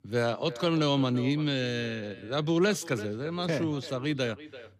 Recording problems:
echo of what is said; noticeable; throughout; 340 ms later, 15 dB below the speech

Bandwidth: 14.5 kHz